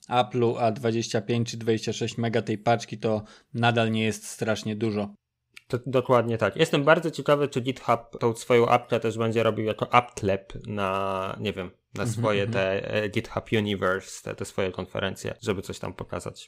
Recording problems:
none

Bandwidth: 15.5 kHz